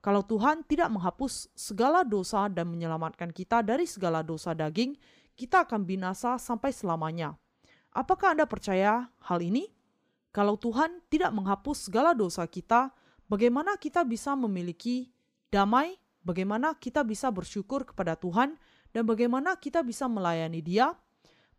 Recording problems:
none

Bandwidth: 15 kHz